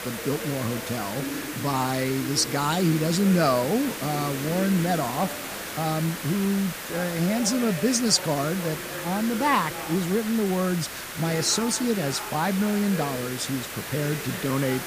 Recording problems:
hiss; loud; throughout; 8 dB below the speech
voice in the background; noticeable; throughout; 15 dB below the speech

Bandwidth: 15 kHz